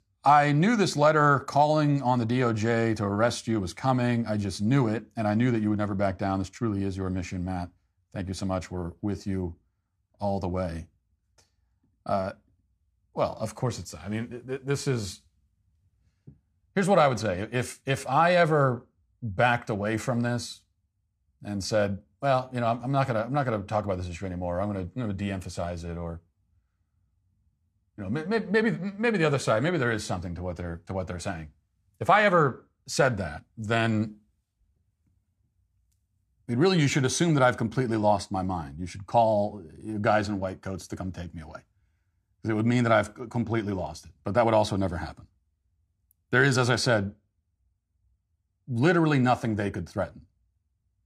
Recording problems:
none

